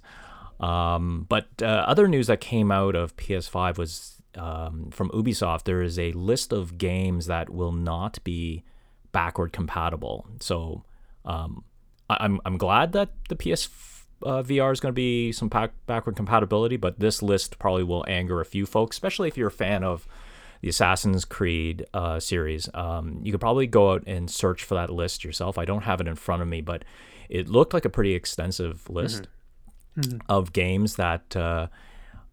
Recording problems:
none

